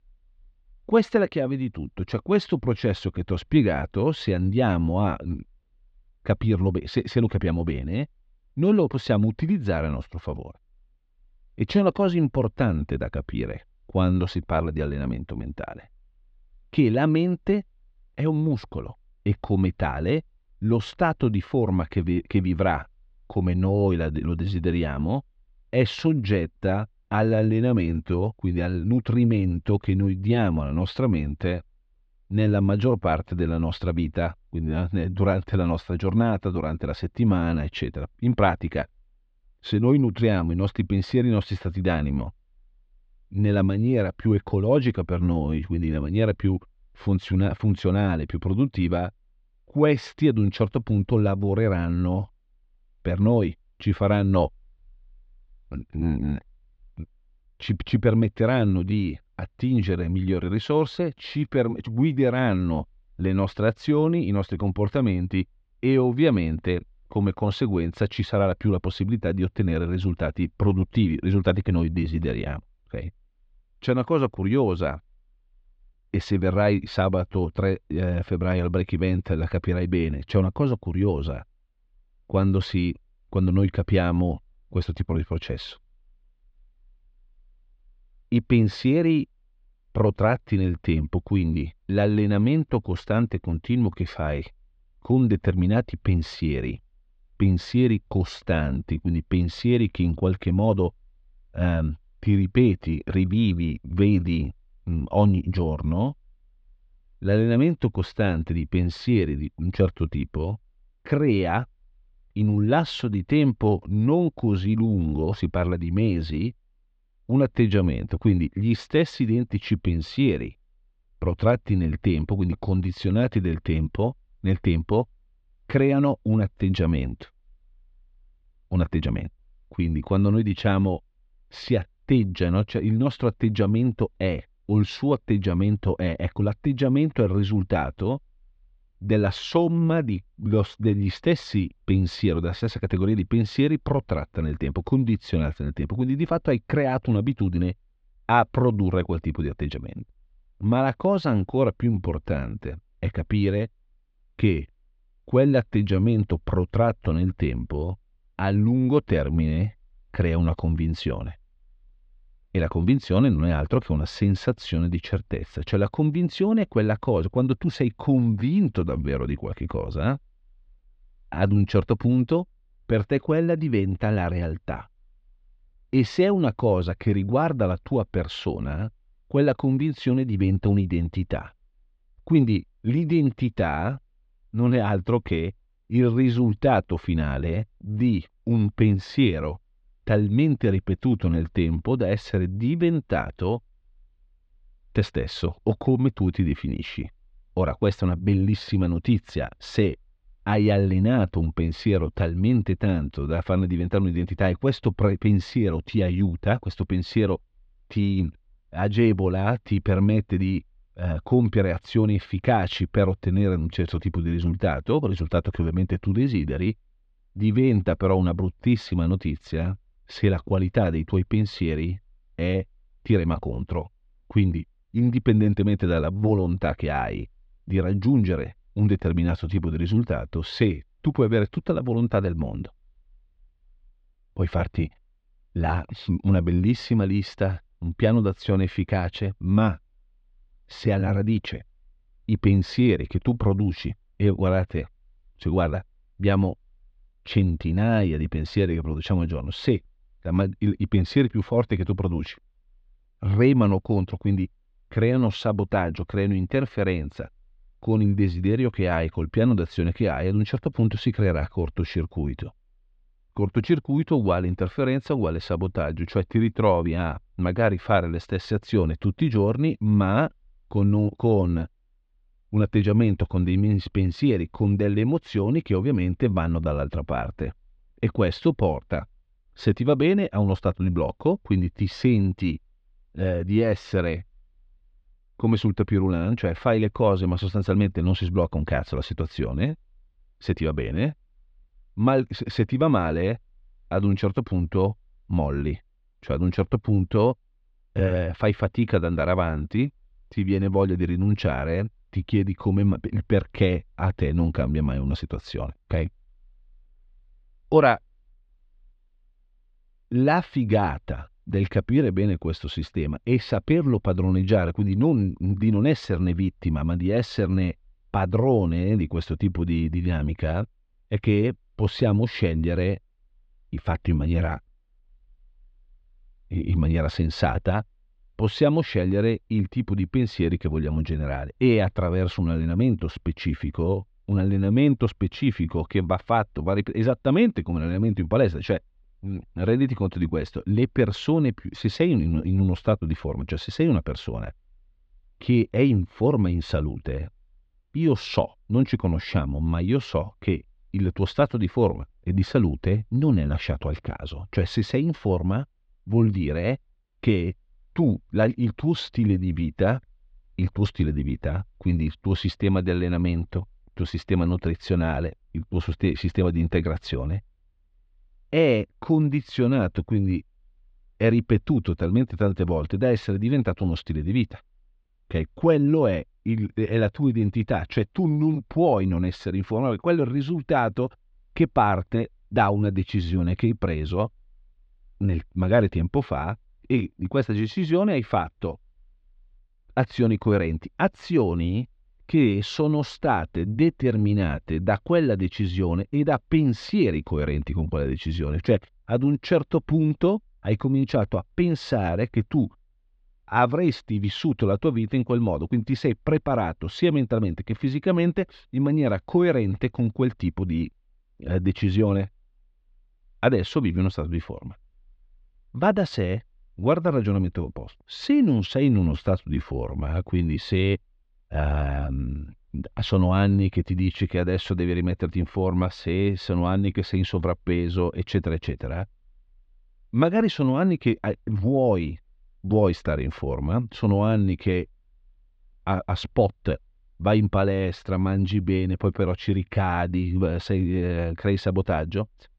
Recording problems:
muffled; slightly; fading above 4 kHz

